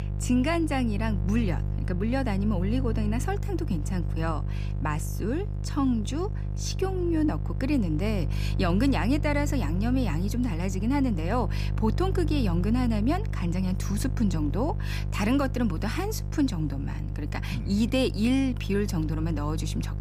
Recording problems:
electrical hum; noticeable; throughout; 50 Hz, 15 dB below the speech

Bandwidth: 15 kHz